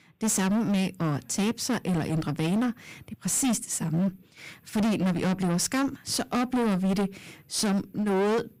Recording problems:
distortion; heavy; 22% of the sound clipped

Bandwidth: 15.5 kHz